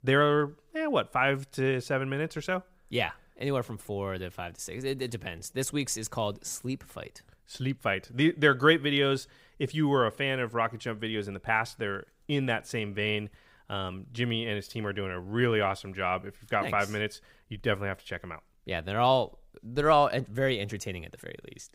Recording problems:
none

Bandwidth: 15.5 kHz